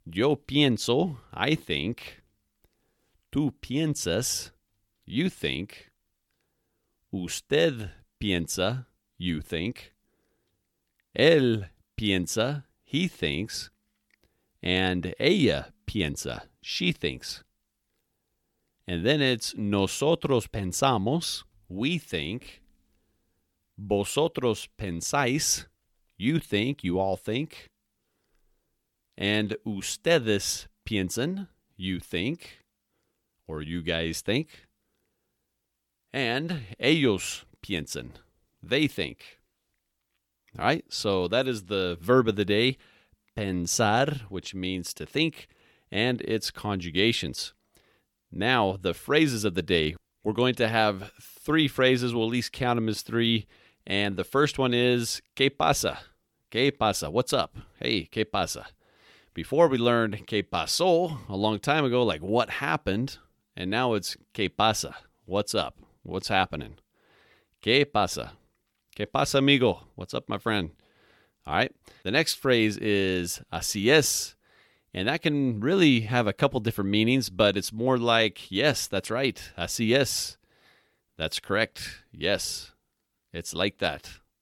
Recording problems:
none

